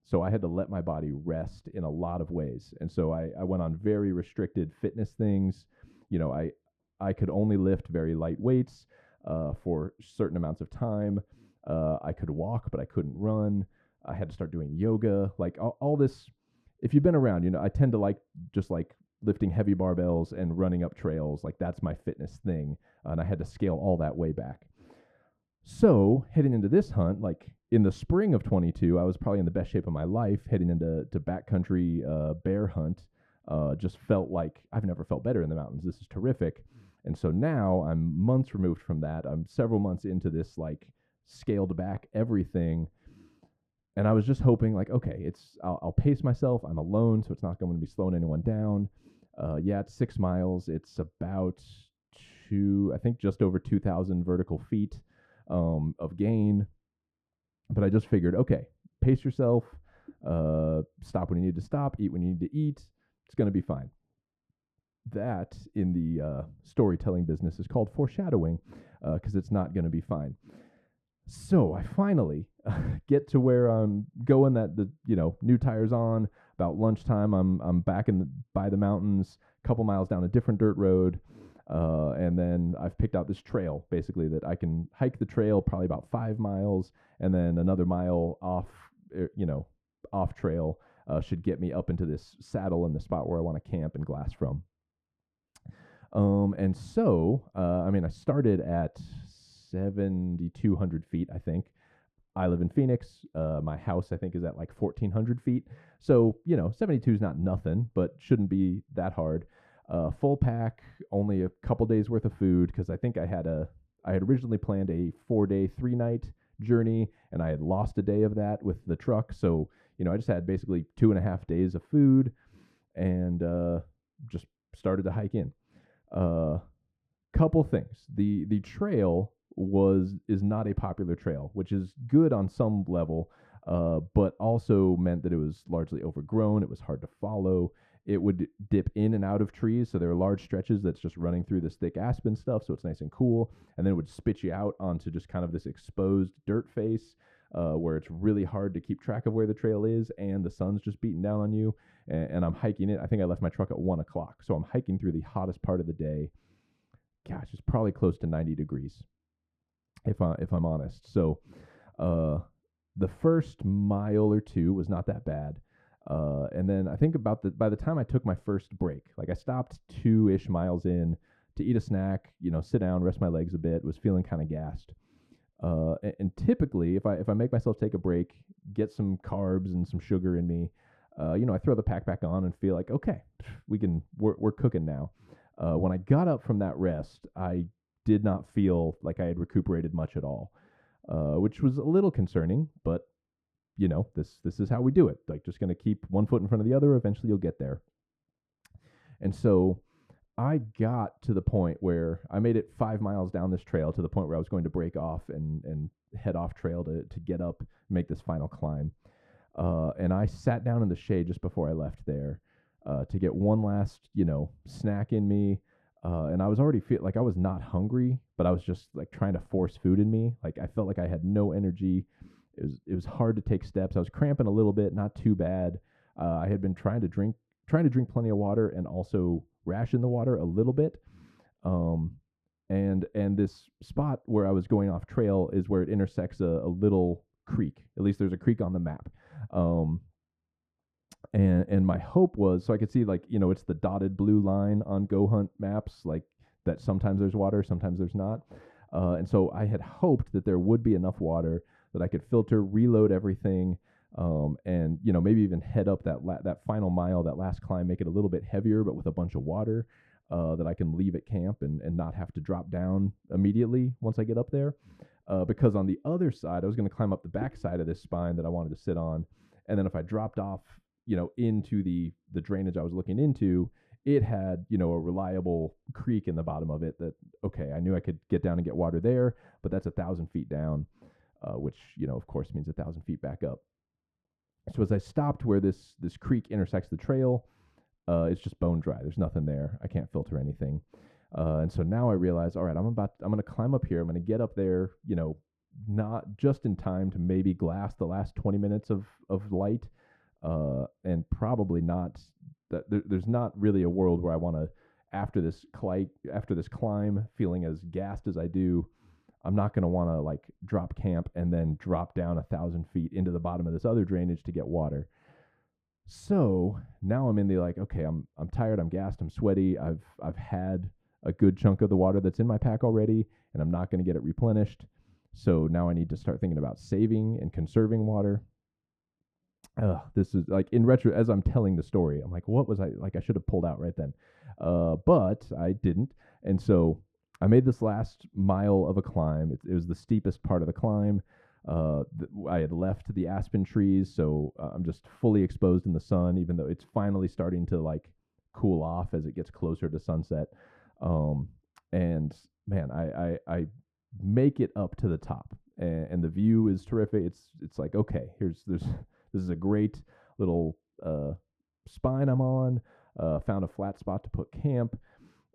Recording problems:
muffled; very; fading above 1.5 kHz

